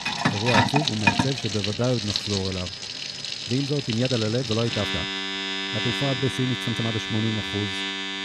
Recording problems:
household noises; very loud; throughout; 1 dB above the speech
high-pitched whine; noticeable; from 2 to 6.5 s; 5 kHz, 10 dB below the speech
uneven, jittery; strongly; from 0.5 to 7.5 s

